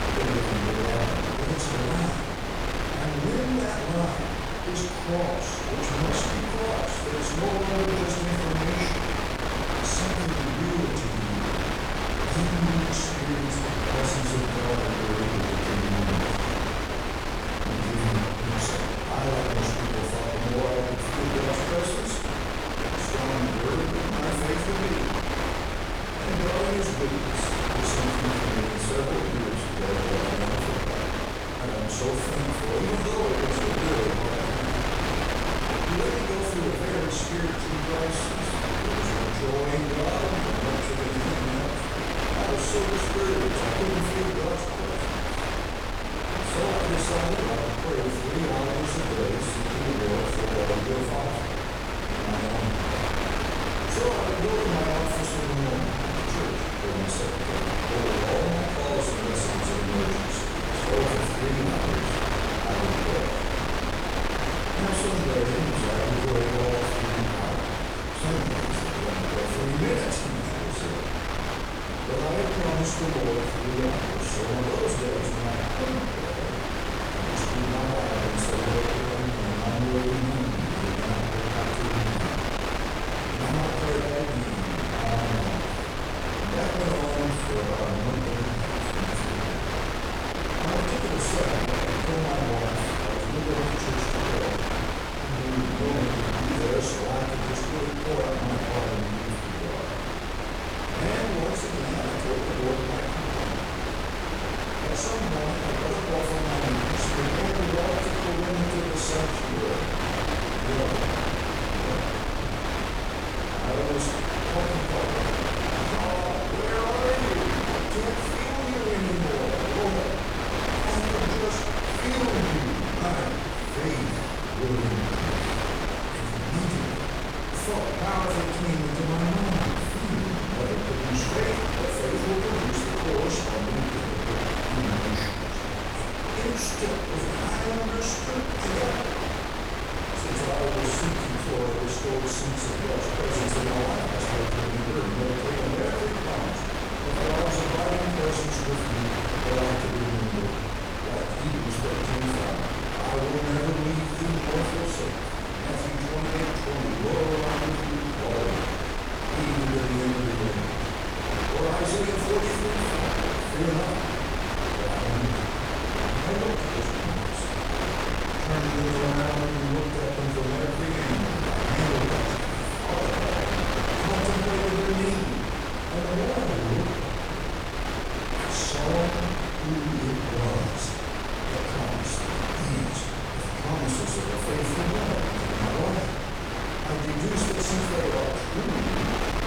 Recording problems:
off-mic speech; far
room echo; noticeable; dies away in 0.9 s
wind noise on the microphone; heavy; 3 dB above the speech

